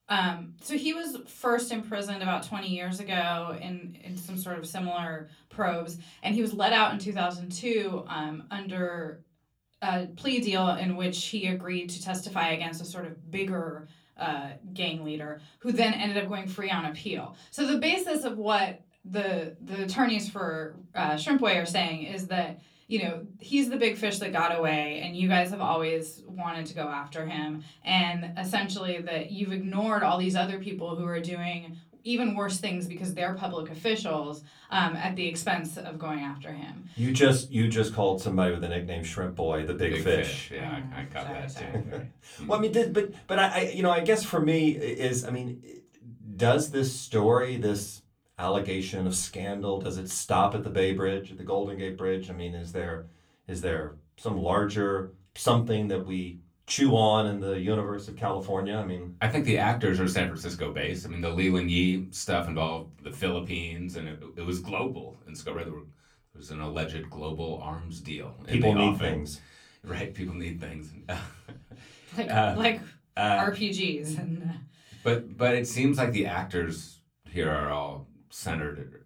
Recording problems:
room echo; very slight; dies away in 0.3 s
off-mic speech; somewhat distant

